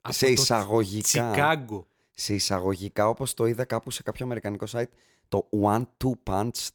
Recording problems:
none

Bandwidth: 18.5 kHz